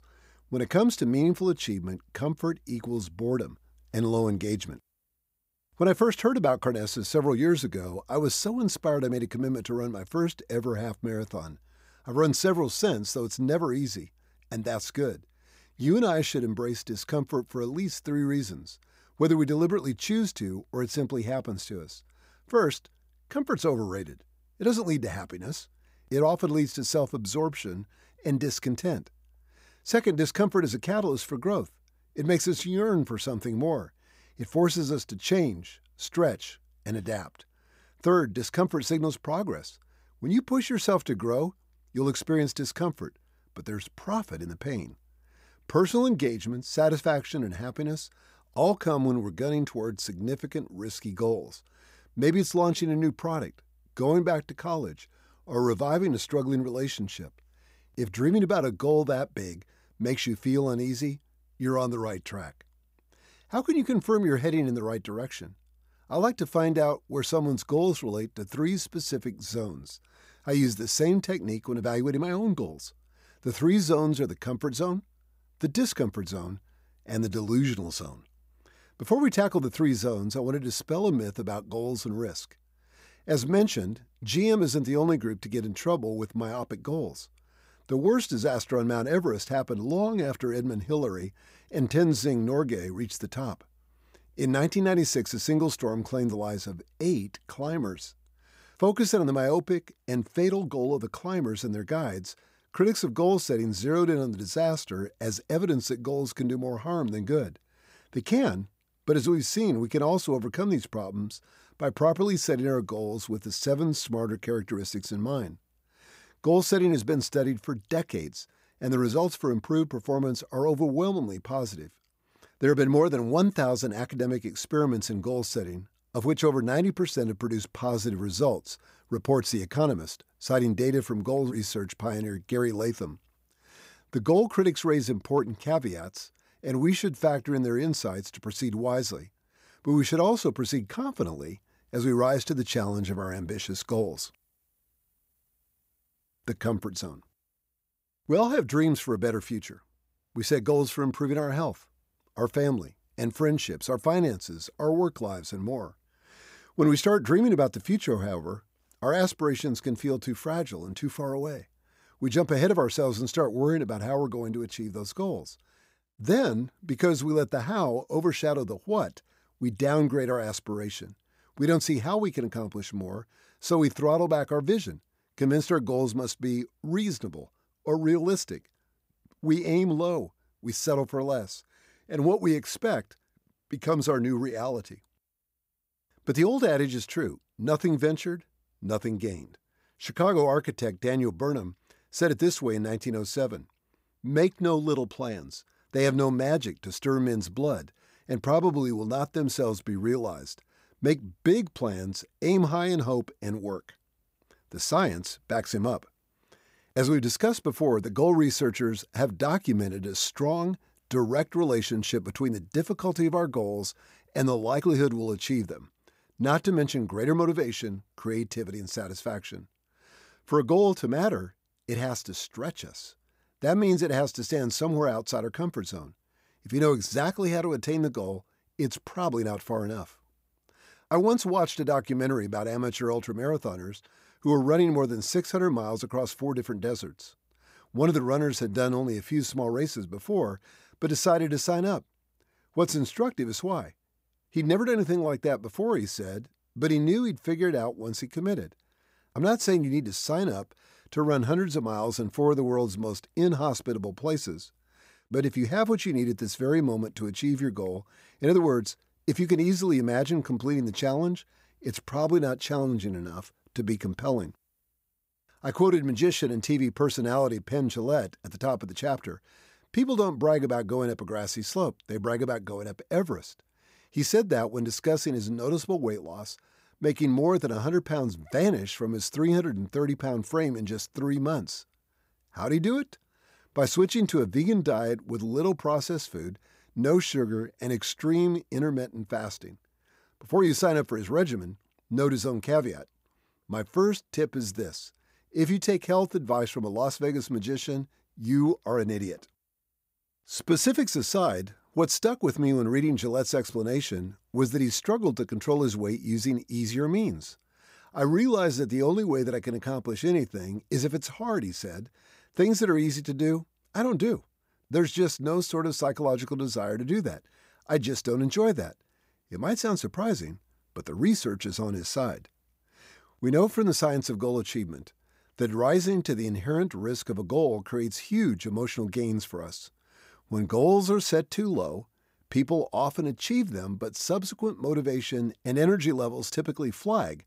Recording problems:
none

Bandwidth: 15.5 kHz